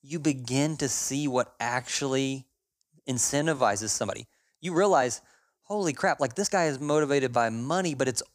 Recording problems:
uneven, jittery; strongly; from 1.5 to 7.5 s

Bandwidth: 15 kHz